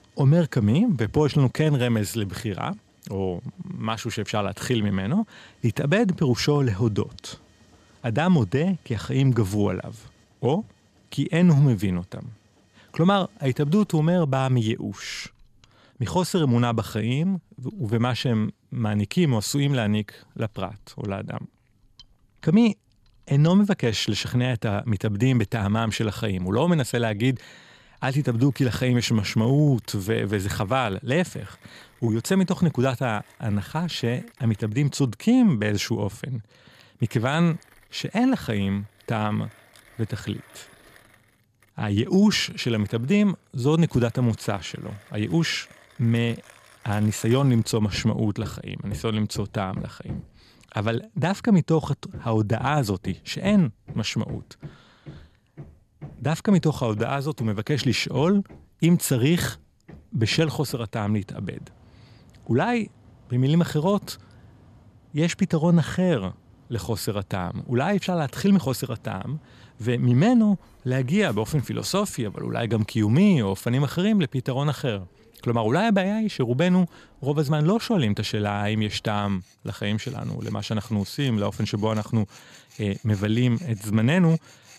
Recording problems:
machinery noise; faint; throughout; 25 dB below the speech

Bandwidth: 14 kHz